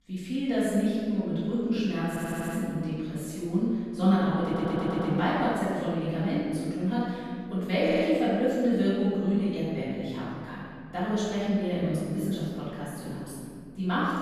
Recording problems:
room echo; strong; dies away in 1.9 s
off-mic speech; far
audio stuttering; at 2 s, at 4.5 s and at 8 s

